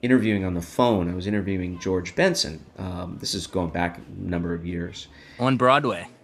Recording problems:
murmuring crowd; faint; throughout; 30 dB below the speech

